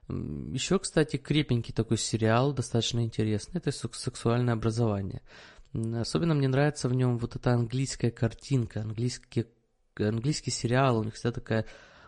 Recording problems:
garbled, watery; slightly; nothing above 10 kHz

